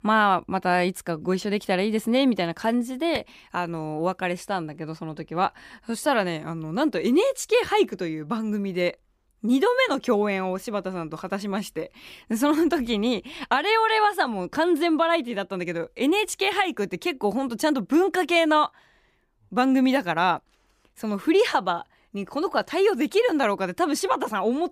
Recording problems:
none

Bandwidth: 15 kHz